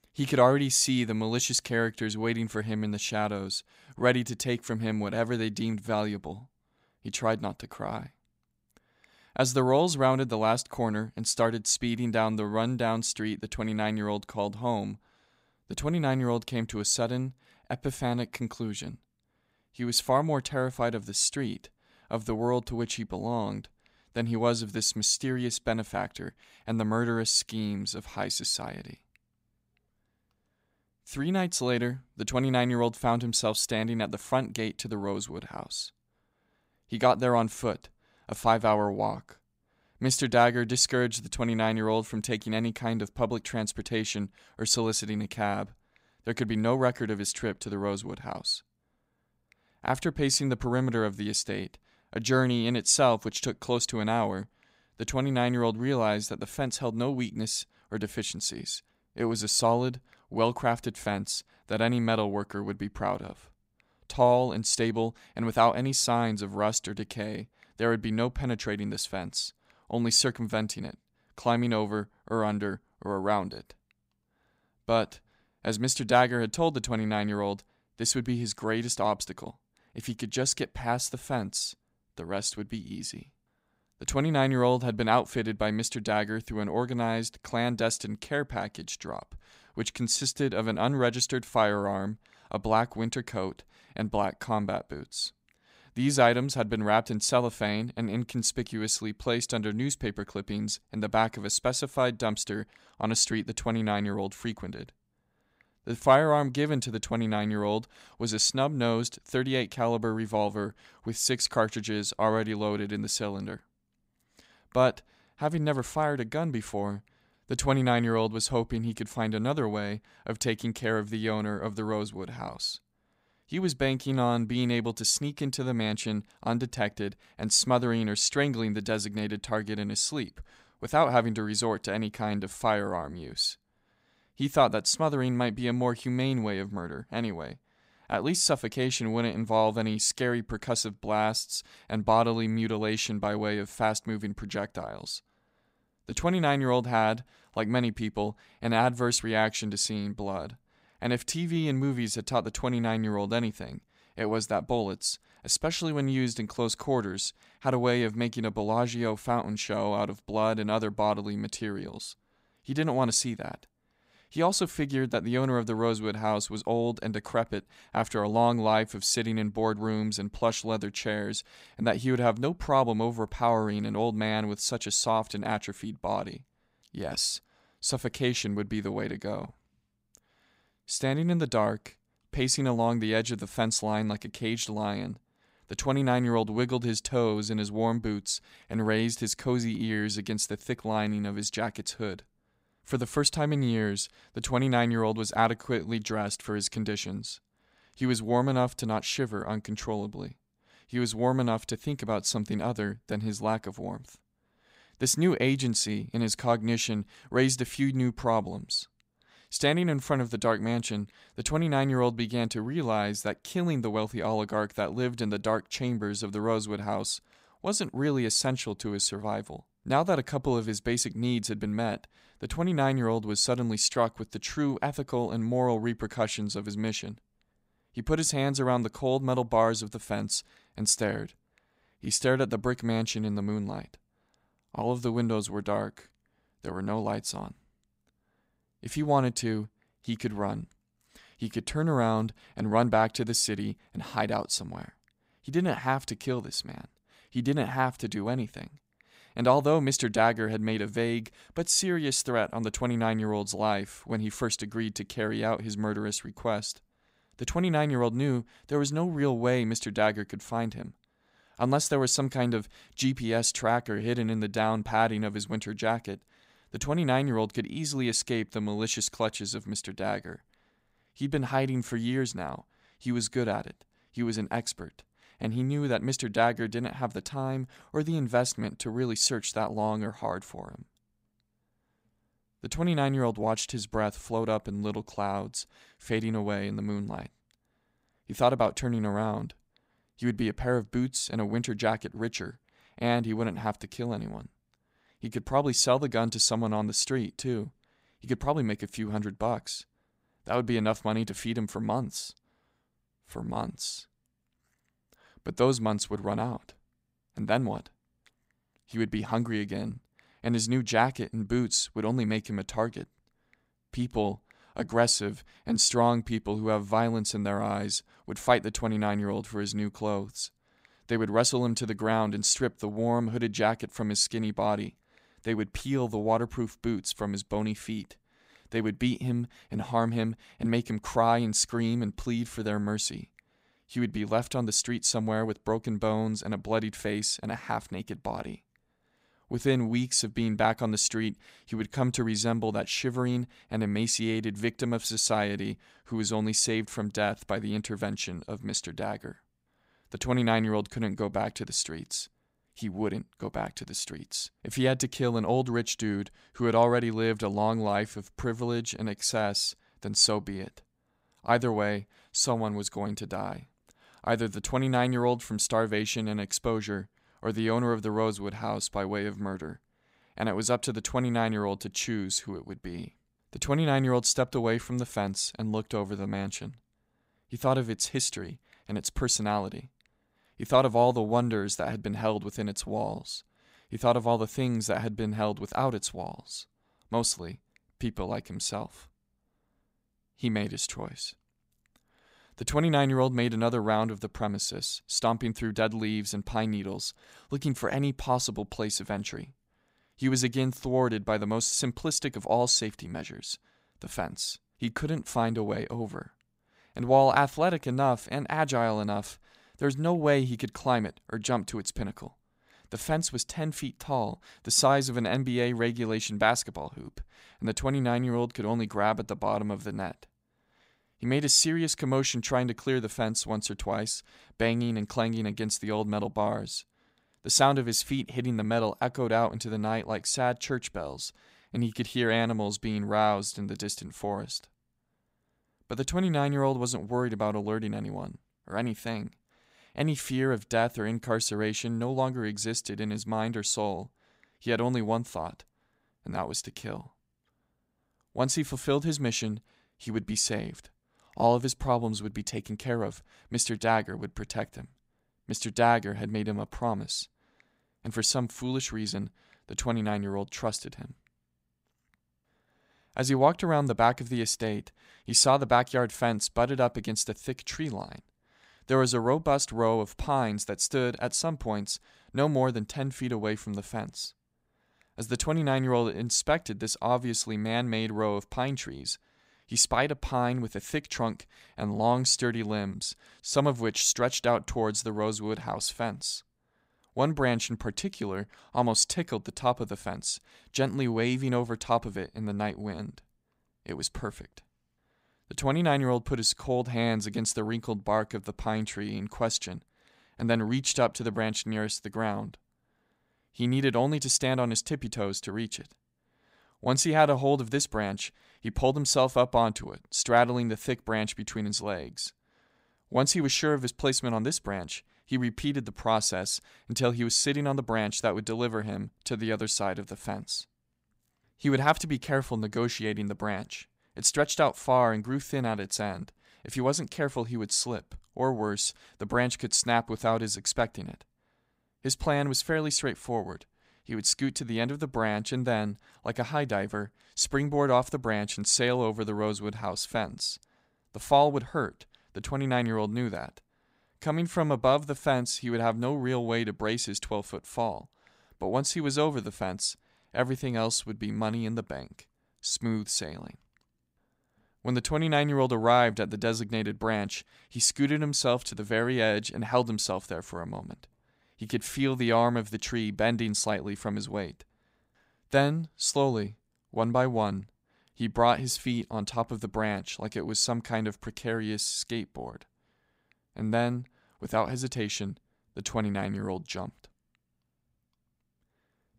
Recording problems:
none

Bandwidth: 15.5 kHz